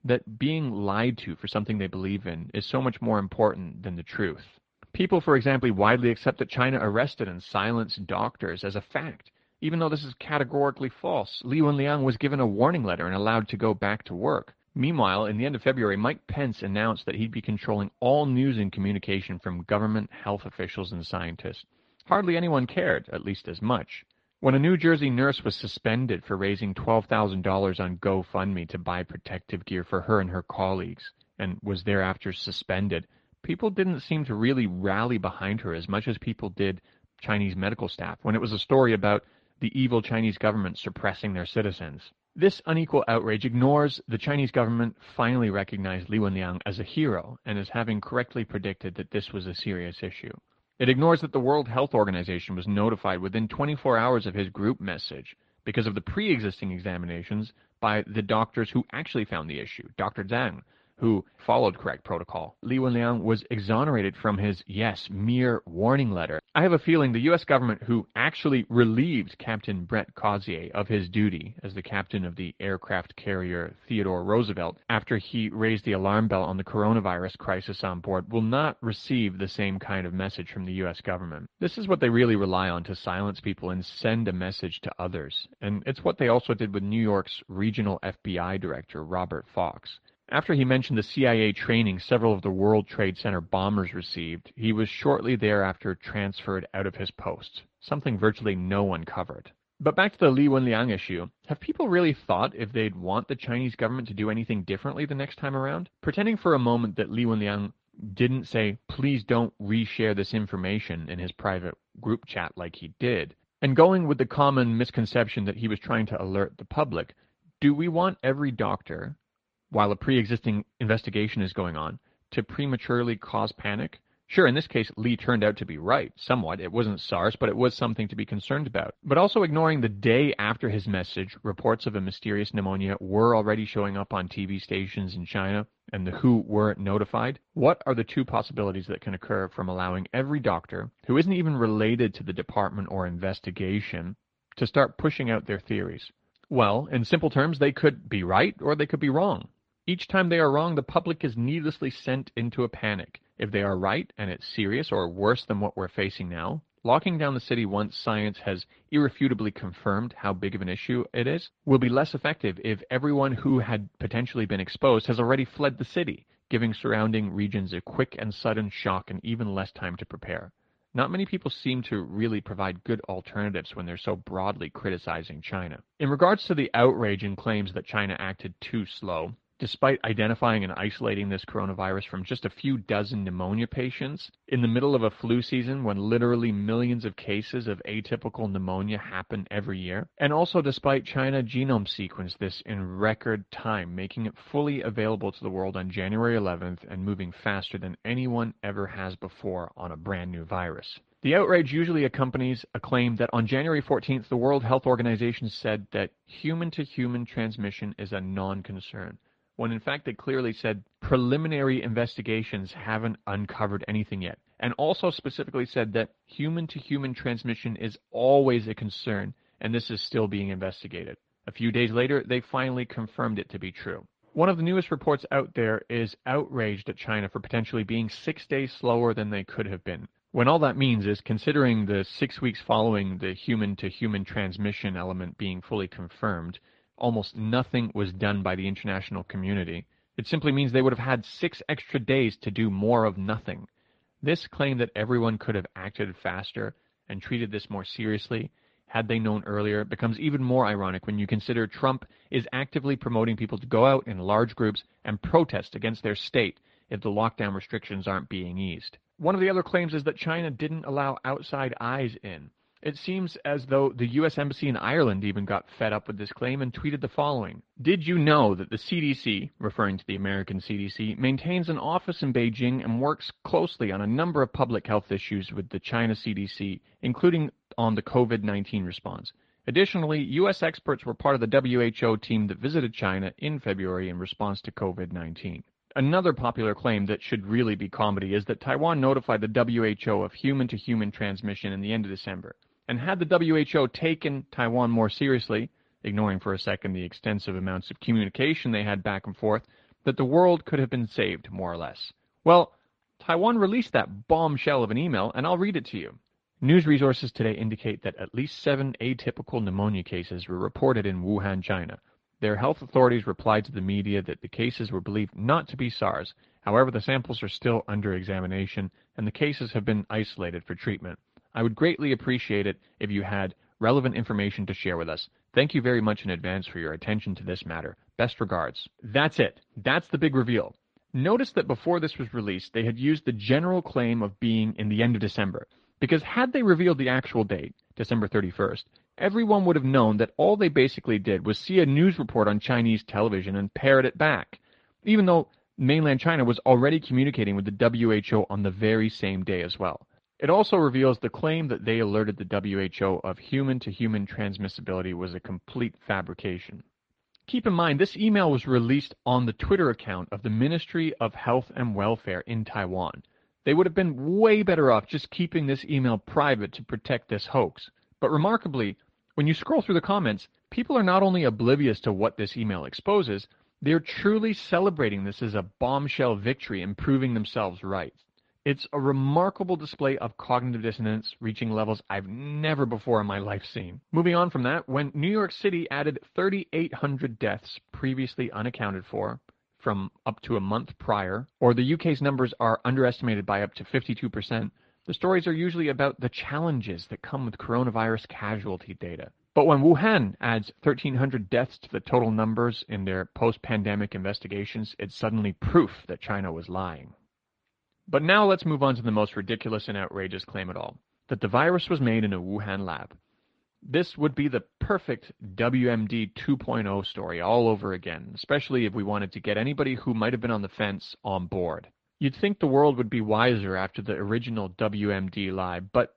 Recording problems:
muffled; slightly; fading above 4 kHz
garbled, watery; slightly

